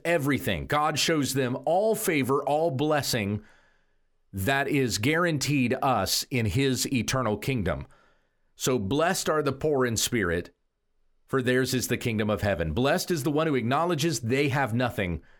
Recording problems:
none

